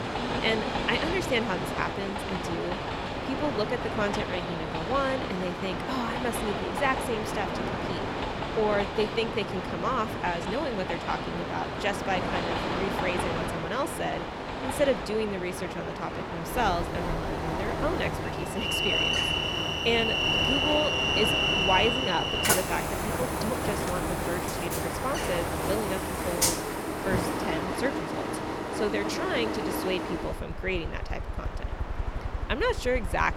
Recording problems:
train or aircraft noise; very loud; throughout; 2 dB above the speech

